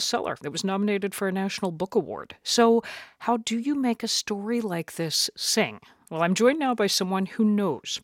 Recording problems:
abrupt cut into speech; at the start

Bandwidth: 16.5 kHz